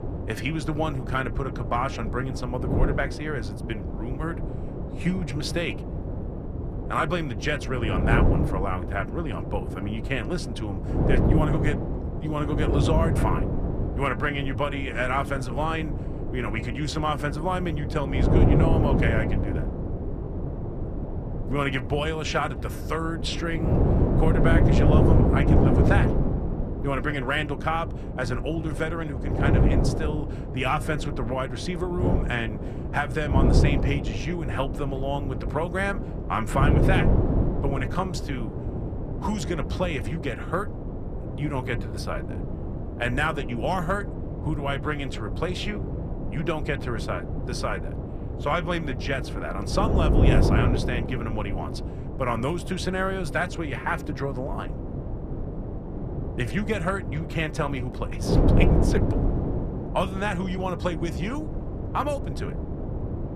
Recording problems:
wind noise on the microphone; heavy; 5 dB below the speech

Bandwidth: 14.5 kHz